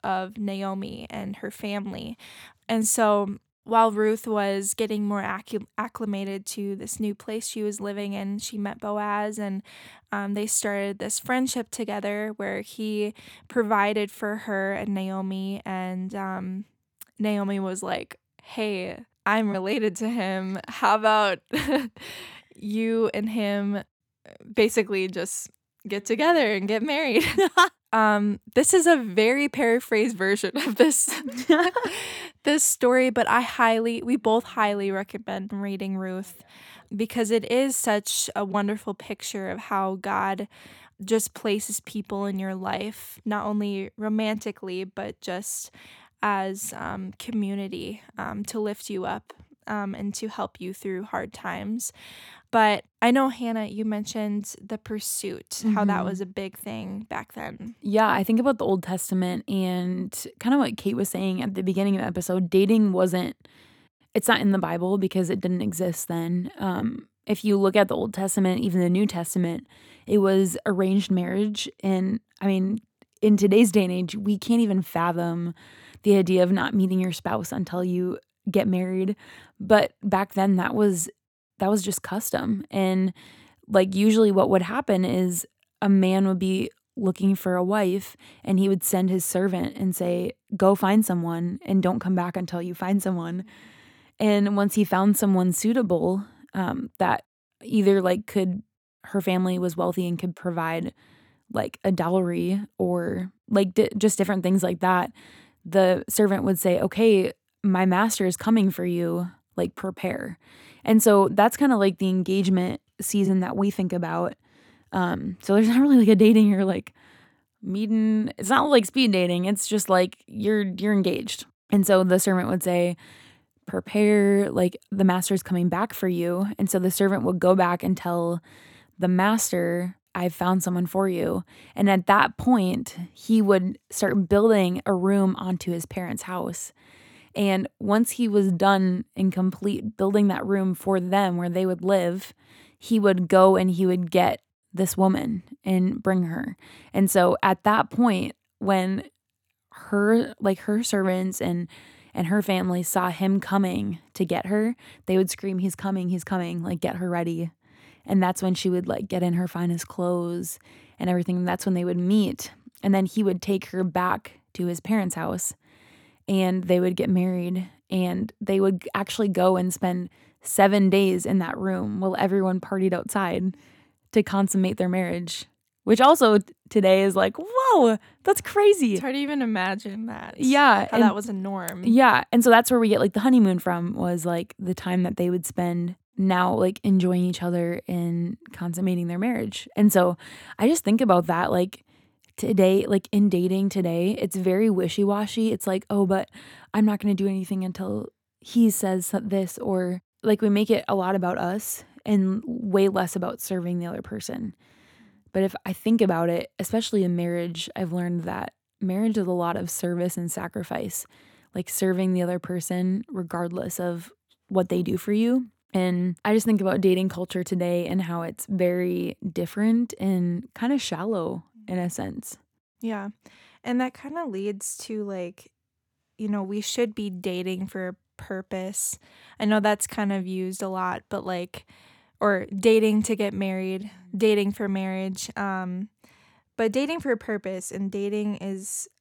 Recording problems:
none

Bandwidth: 18.5 kHz